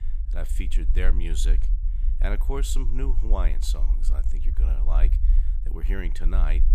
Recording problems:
low rumble; noticeable; throughout; 10 dB below the speech

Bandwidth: 14.5 kHz